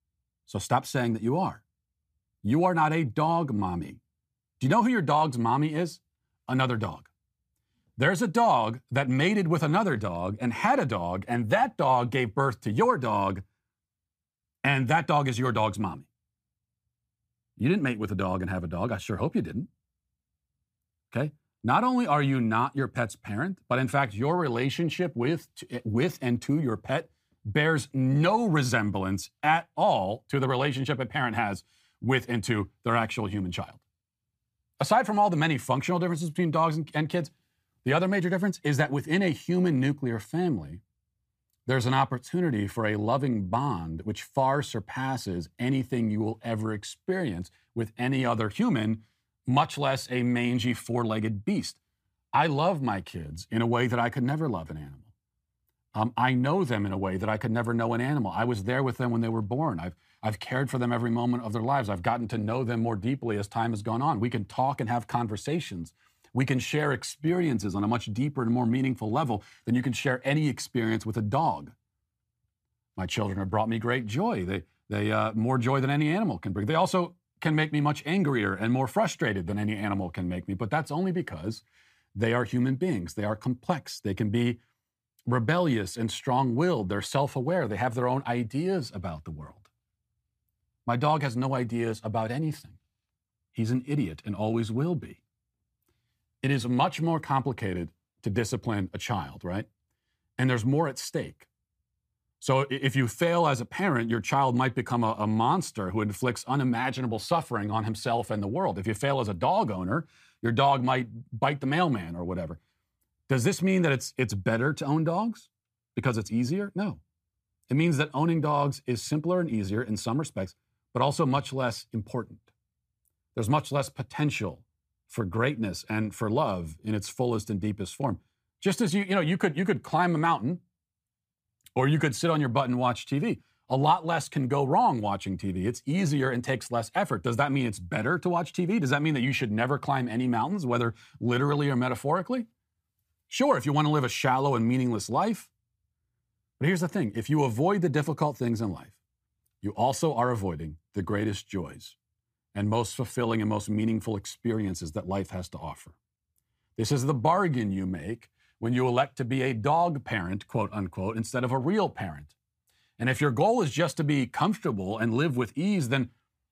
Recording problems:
none

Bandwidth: 15 kHz